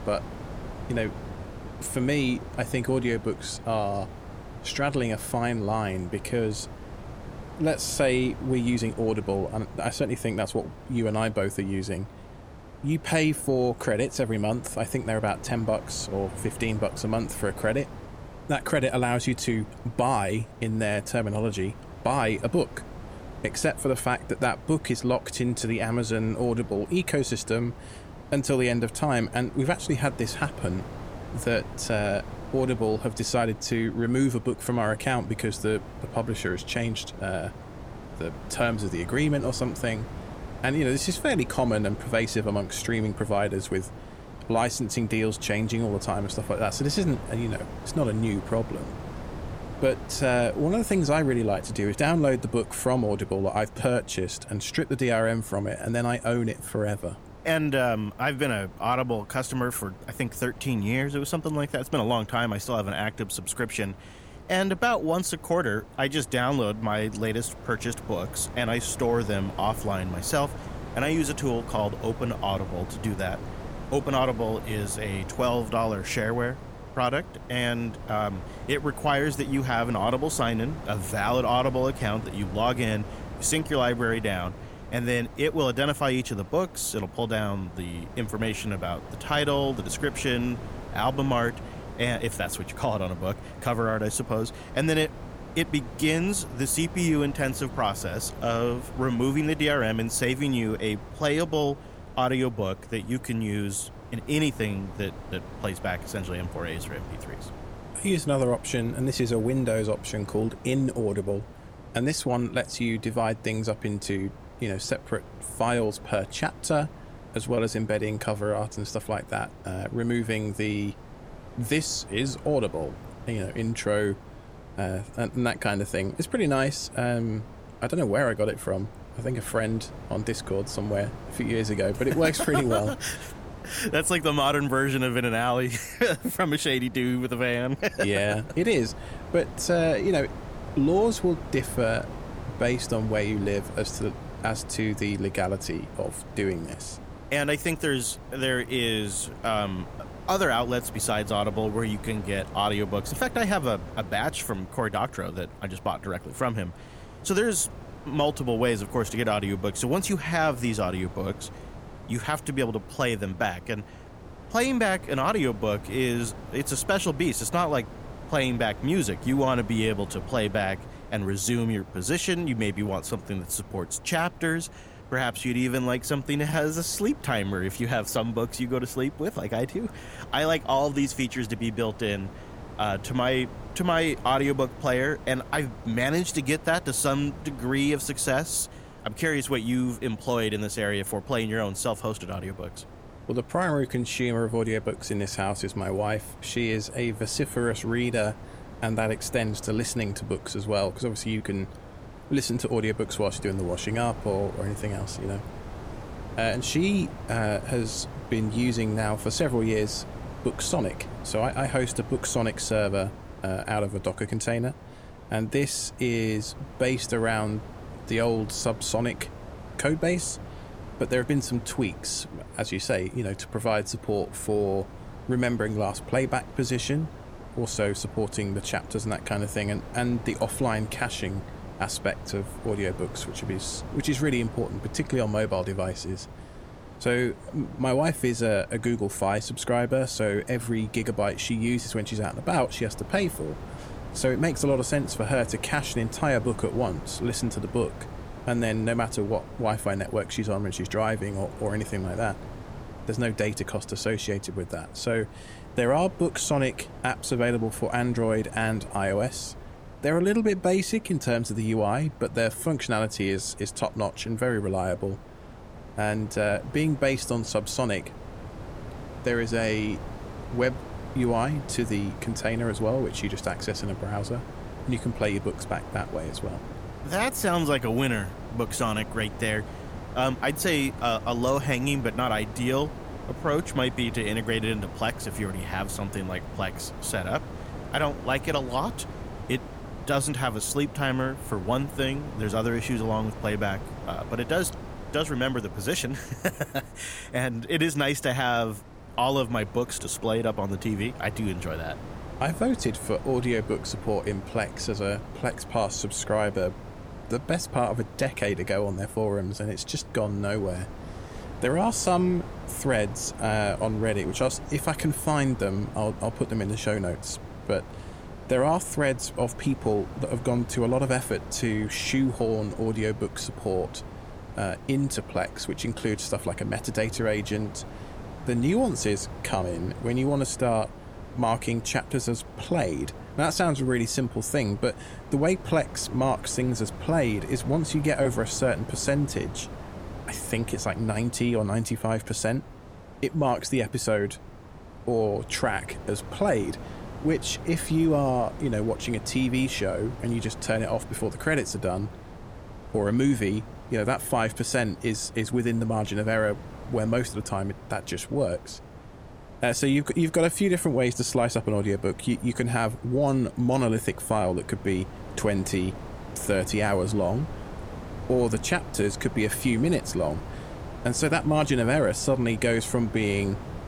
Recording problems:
wind noise on the microphone; occasional gusts; 15 dB below the speech

